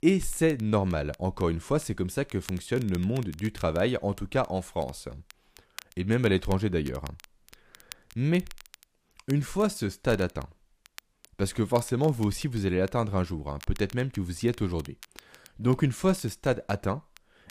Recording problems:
crackle, like an old record; faint; 20 dB below the speech

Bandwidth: 15 kHz